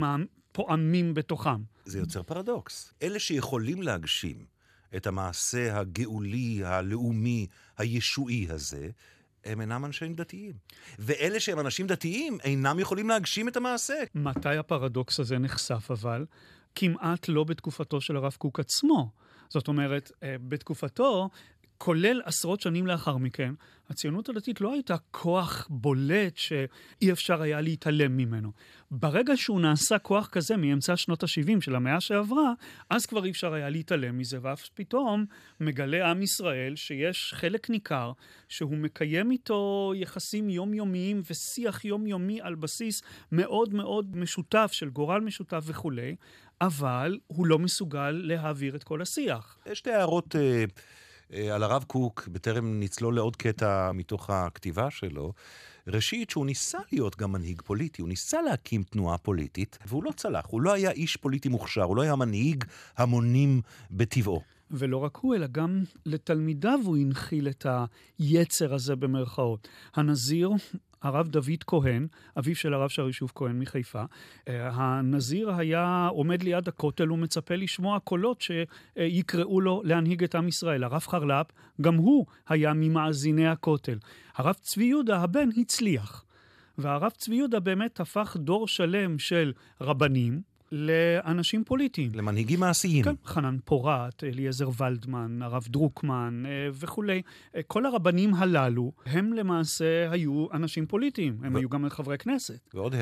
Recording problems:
abrupt cut into speech; at the start and the end

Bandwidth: 14.5 kHz